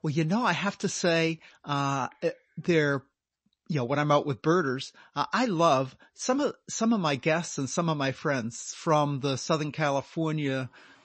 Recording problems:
garbled, watery; slightly; nothing above 7.5 kHz

